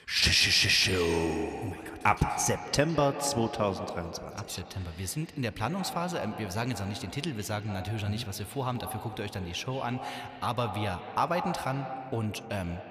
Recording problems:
echo of what is said; strong; throughout; 160 ms later, 9 dB below the speech

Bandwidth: 14.5 kHz